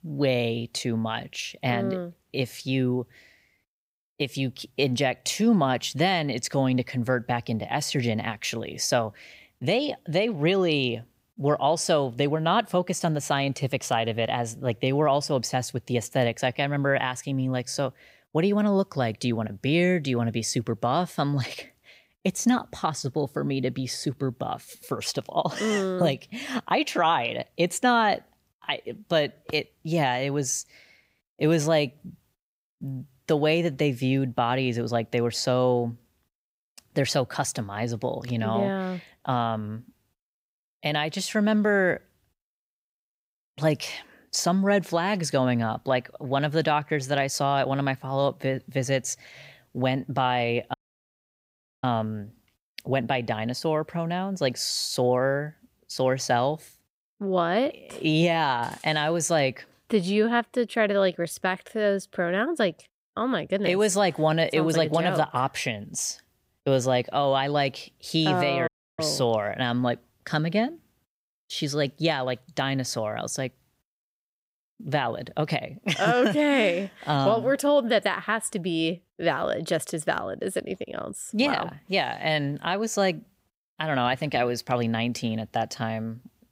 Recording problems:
audio cutting out; at 51 s for 1 s and at 1:09

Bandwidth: 15.5 kHz